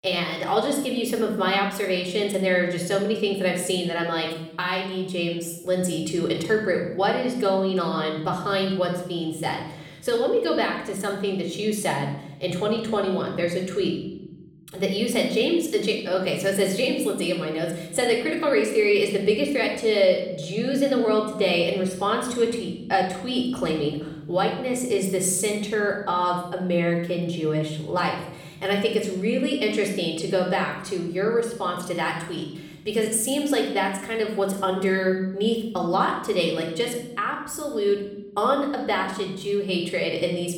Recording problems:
room echo; noticeable; dies away in 1.2 s
off-mic speech; somewhat distant

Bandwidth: 17 kHz